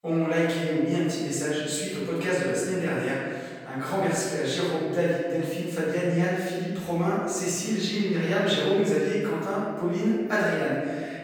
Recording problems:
room echo; strong; dies away in 1.7 s
off-mic speech; far

